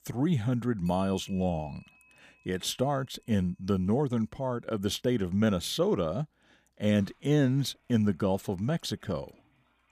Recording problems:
household noises; faint; throughout; 30 dB below the speech

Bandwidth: 14.5 kHz